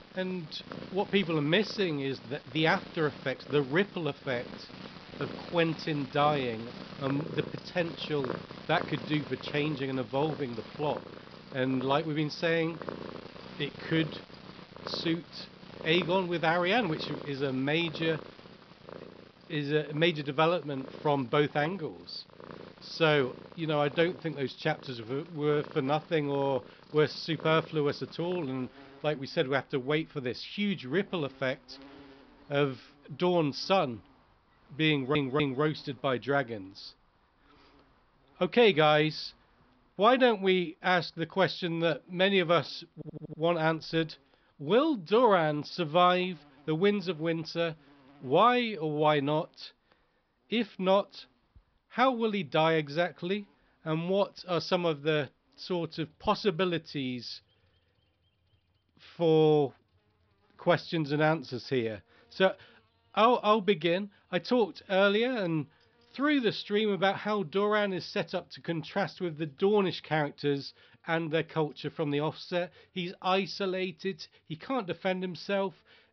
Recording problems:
high frequencies cut off; noticeable; nothing above 5.5 kHz
animal sounds; noticeable; throughout; 15 dB below the speech
audio stuttering; at 35 s and at 43 s

